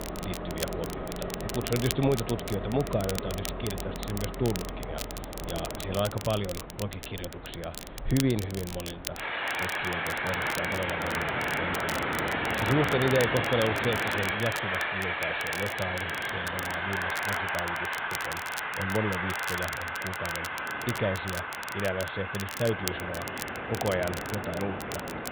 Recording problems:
high frequencies cut off; severe; nothing above 4 kHz
train or aircraft noise; very loud; throughout; 1 dB above the speech
crackle, like an old record; loud; 8 dB below the speech

